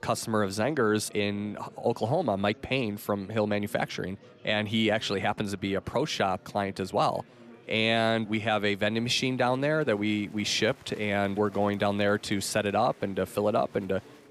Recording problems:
murmuring crowd; faint; throughout; 25 dB below the speech

